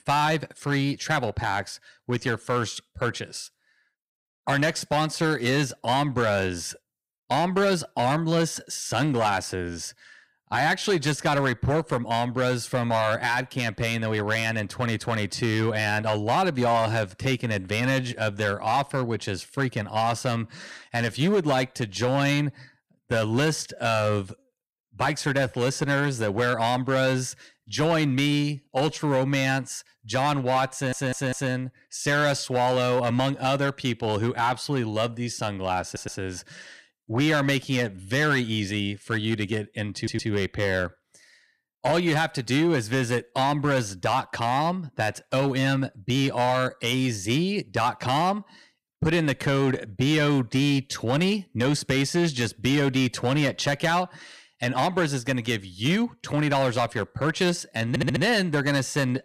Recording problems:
distortion; slight; 6% of the sound clipped
audio stuttering; 4 times, first at 31 s

